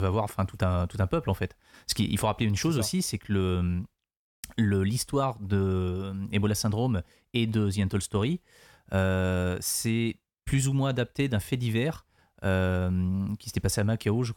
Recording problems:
abrupt cut into speech; at the start

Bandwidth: 18 kHz